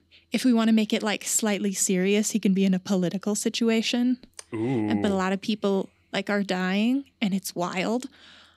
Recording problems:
none

